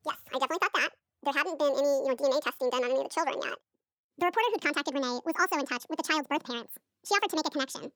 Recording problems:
wrong speed and pitch; too fast and too high; 1.7 times normal speed

